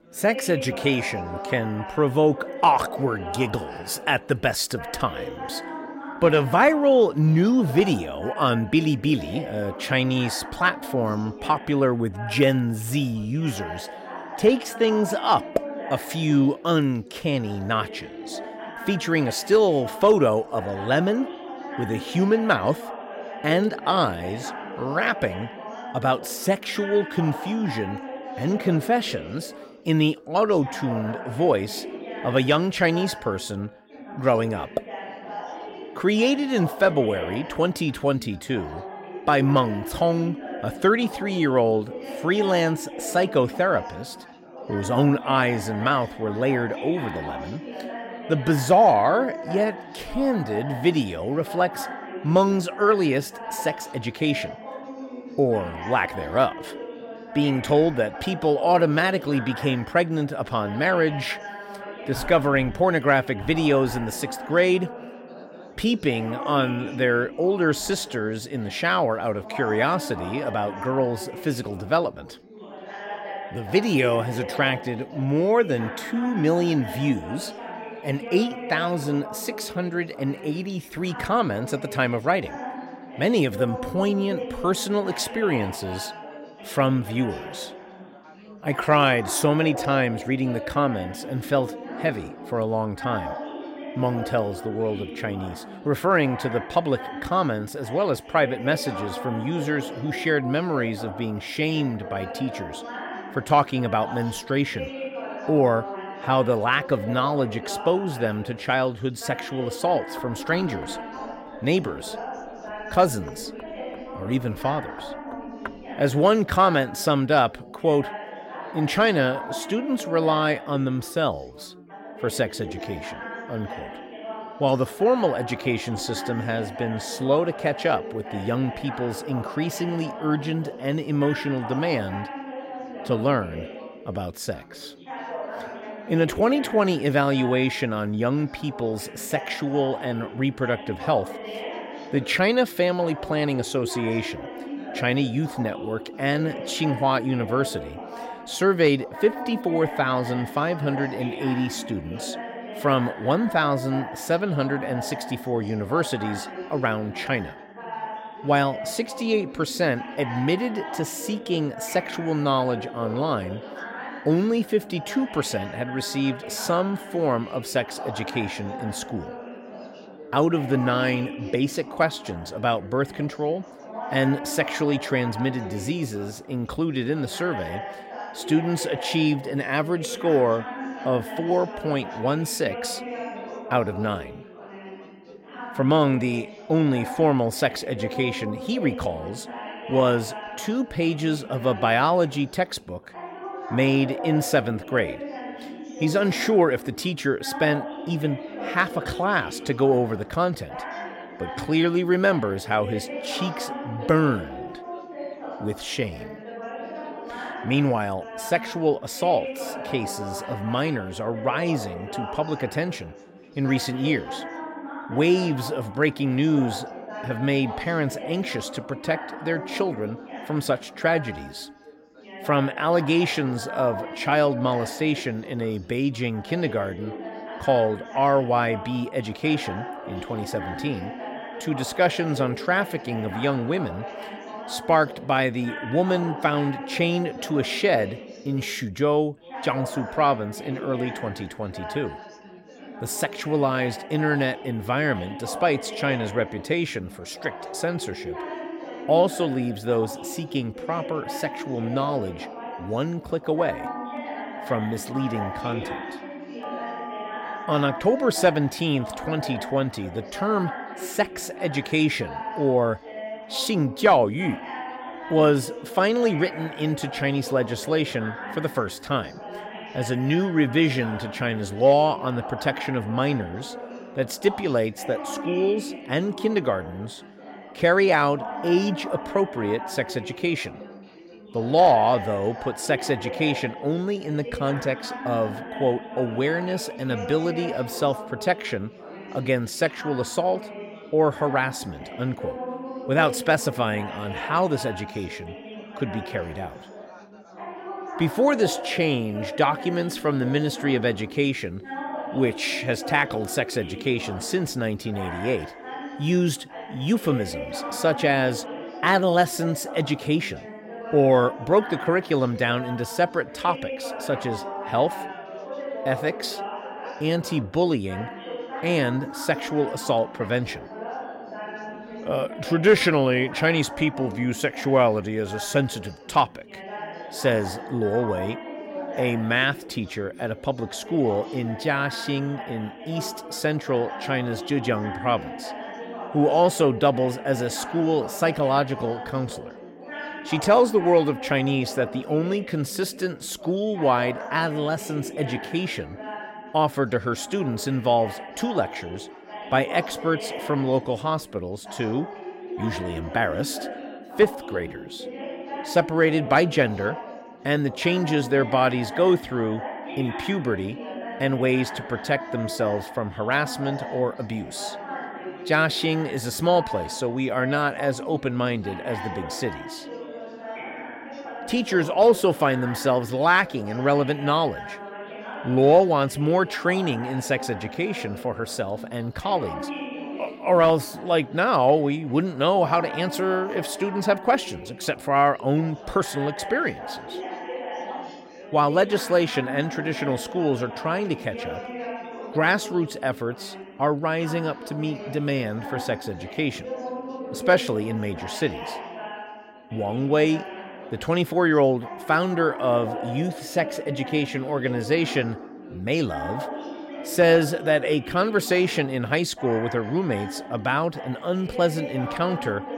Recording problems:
chatter from many people; noticeable; throughout; 10 dB below the speech
door banging; faint; from 1:50 to 1:56; peak 15 dB below the speech
phone ringing; faint; from 4:14 to 4:18; peak 10 dB below the speech
dog barking; faint; from 5:14 to 5:22; peak 10 dB below the speech

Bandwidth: 16 kHz